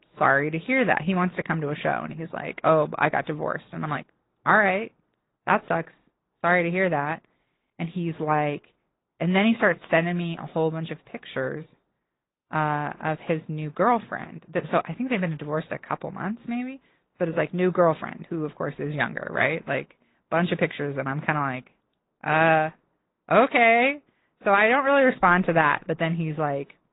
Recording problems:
high frequencies cut off; severe; nothing above 4 kHz
garbled, watery; slightly

